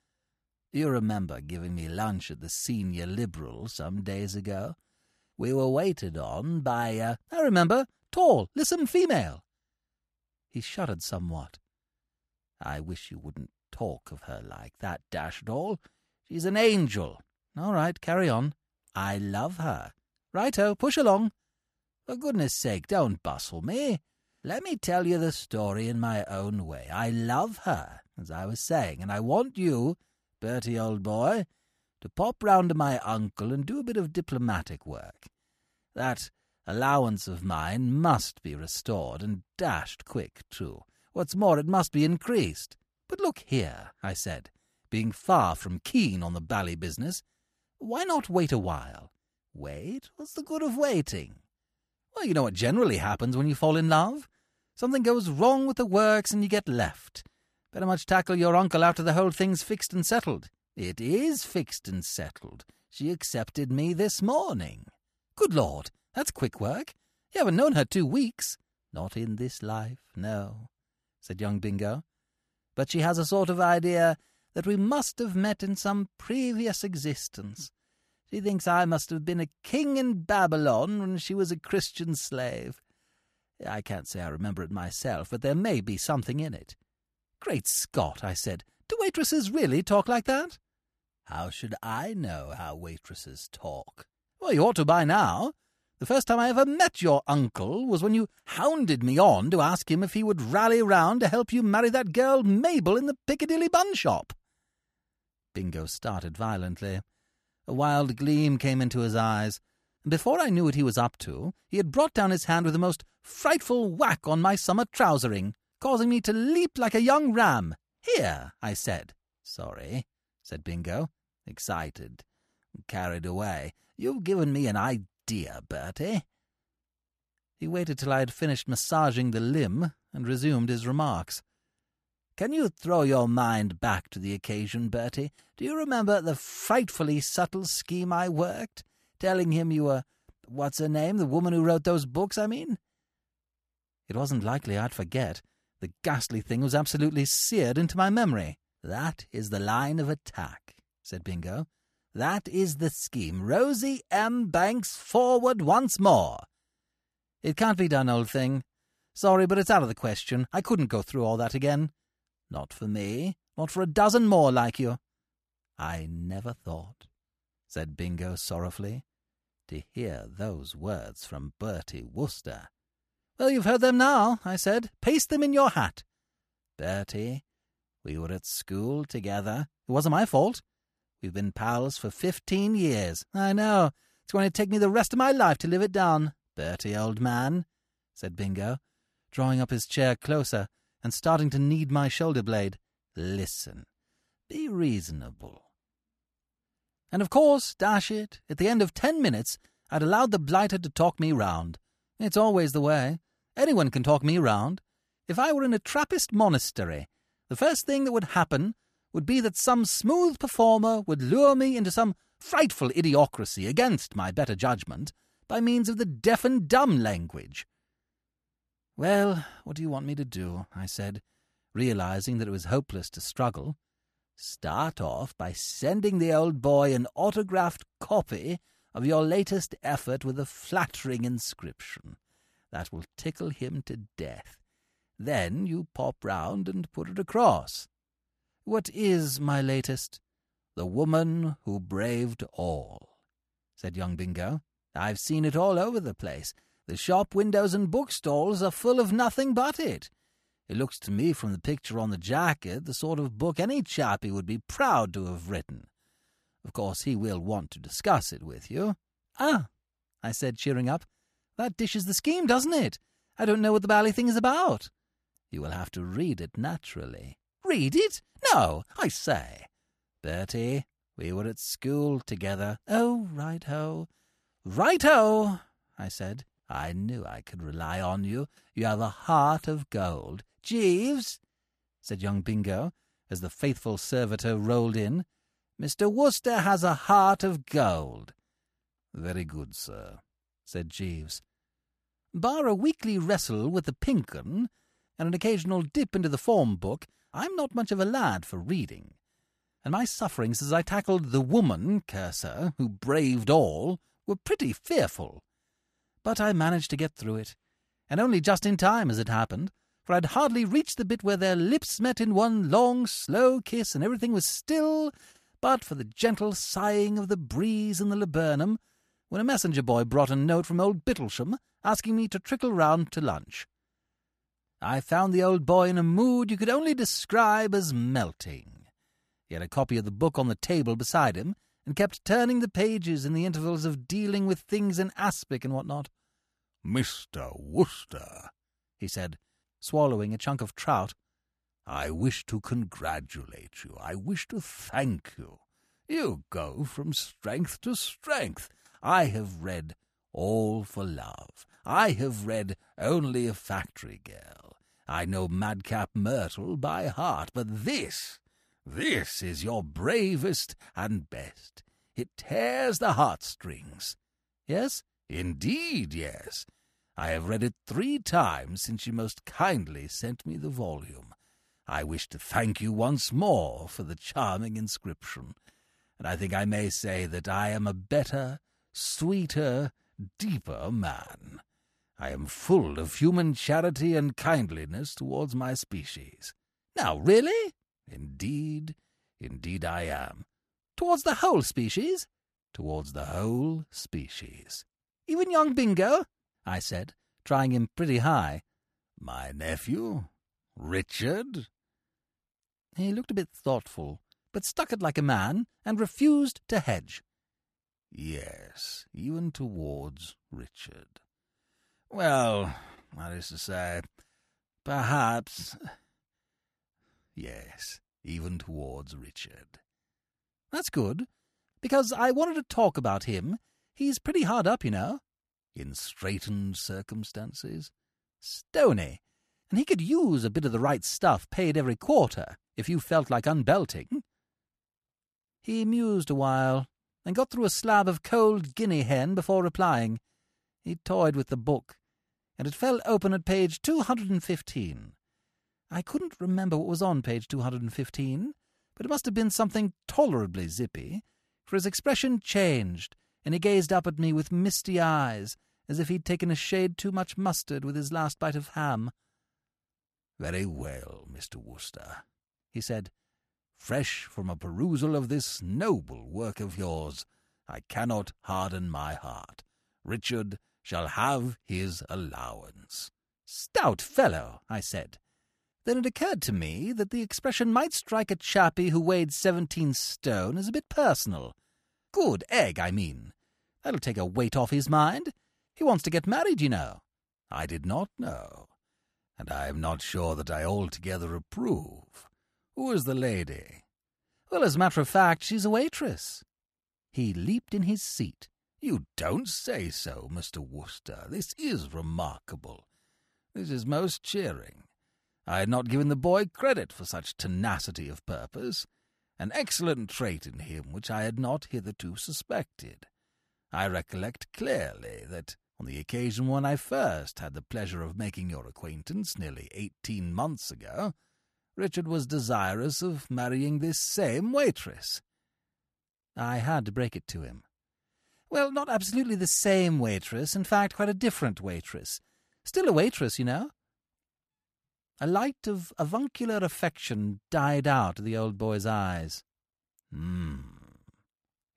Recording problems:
none

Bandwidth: 14.5 kHz